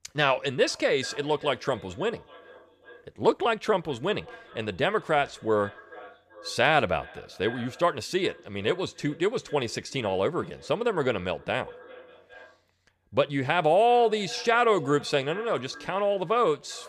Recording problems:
echo of what is said; faint; throughout; 400 ms later, 20 dB below the speech

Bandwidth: 14.5 kHz